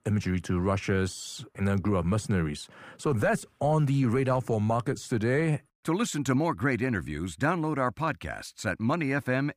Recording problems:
muffled; slightly; fading above 2.5 kHz

